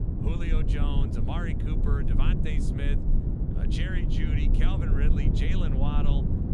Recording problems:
low rumble; loud; throughout; as loud as the speech

